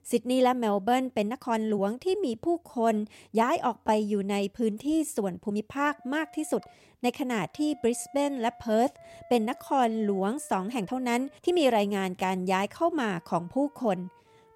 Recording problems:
background music; faint; throughout; 25 dB below the speech
uneven, jittery; strongly; from 1 to 13 s

